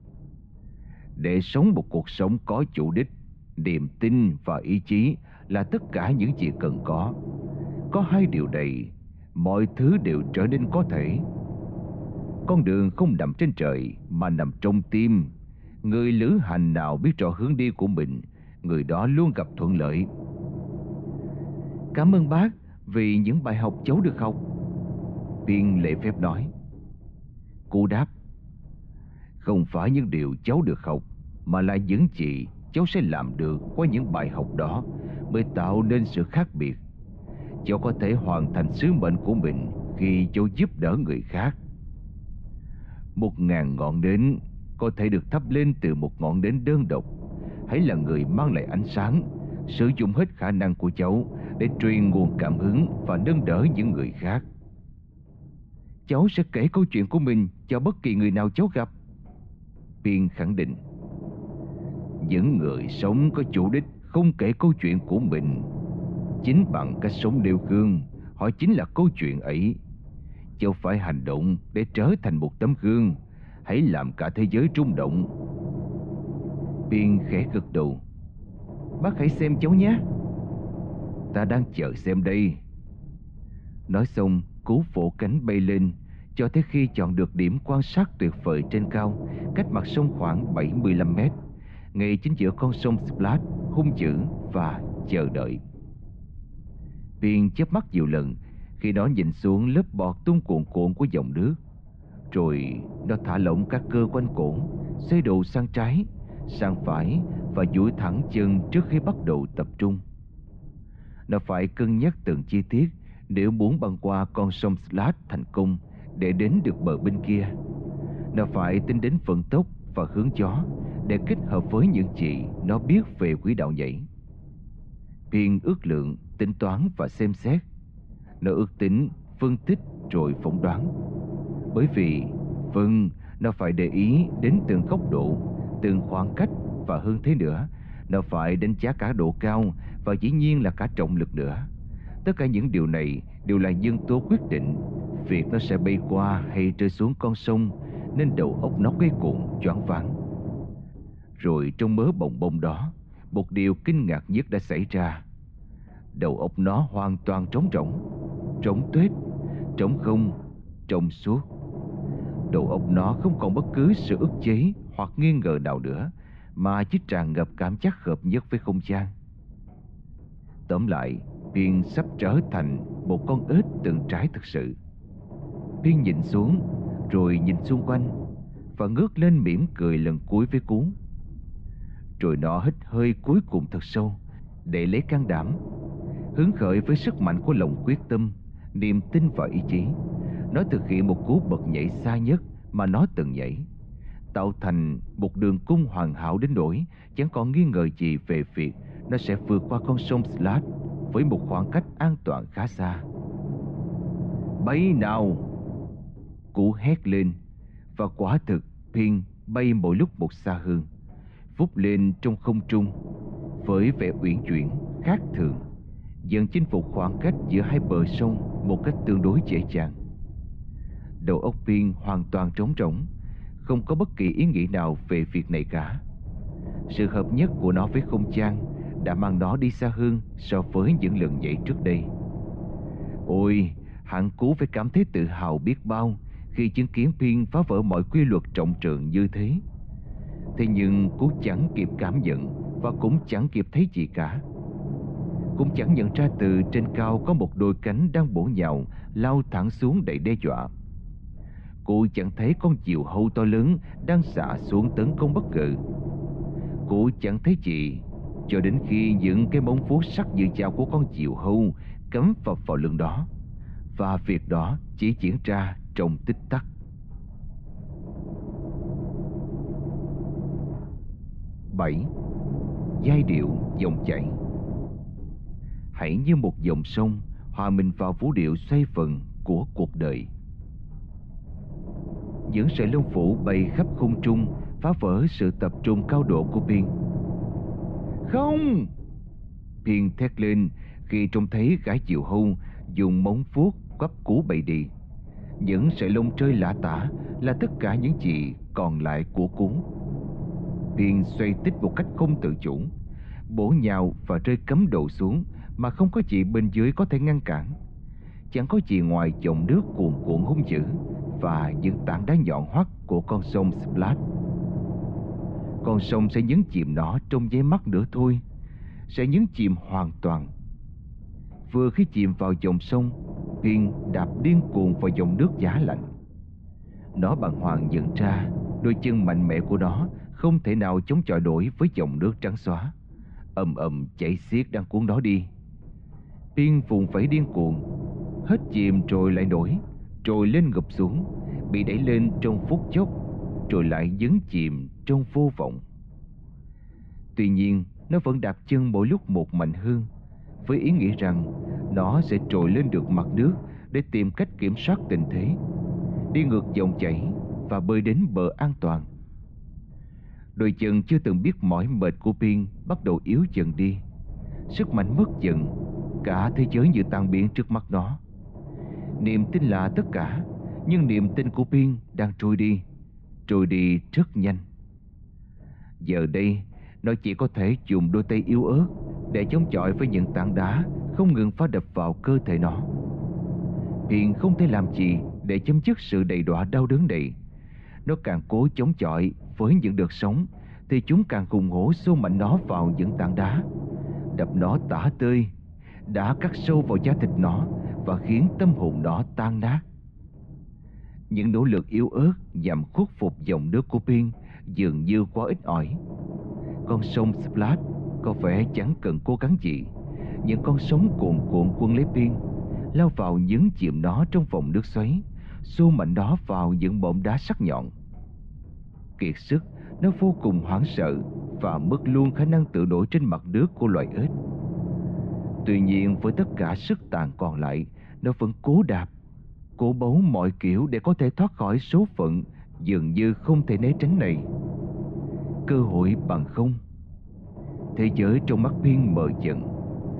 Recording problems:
muffled; very; fading above 3 kHz
low rumble; noticeable; throughout; 10 dB below the speech

